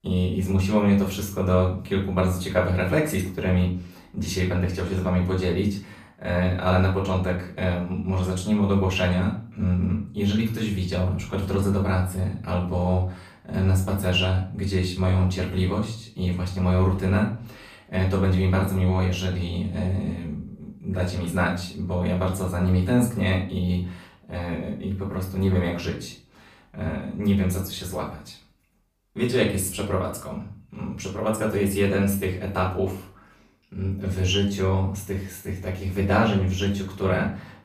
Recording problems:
off-mic speech; far
room echo; slight; dies away in 0.4 s

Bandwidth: 15 kHz